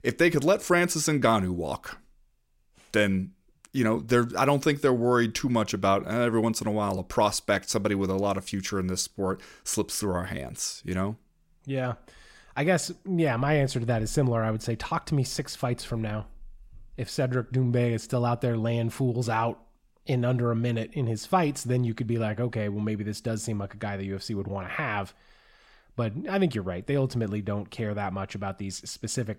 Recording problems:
none

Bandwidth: 16 kHz